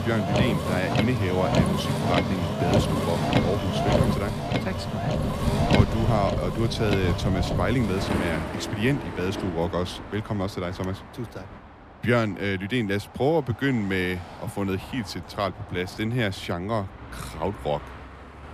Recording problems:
traffic noise; very loud; throughout; 2 dB above the speech

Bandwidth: 14.5 kHz